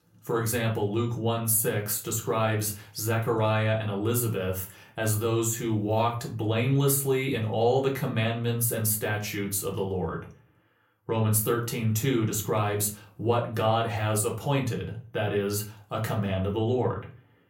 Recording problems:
room echo; very slight; dies away in 0.3 s
off-mic speech; somewhat distant

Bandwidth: 16 kHz